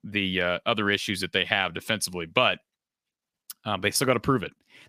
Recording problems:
none

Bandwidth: 15 kHz